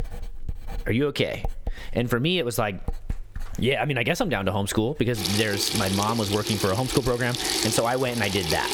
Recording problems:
squashed, flat; somewhat, background pumping
household noises; loud; throughout; 5 dB below the speech

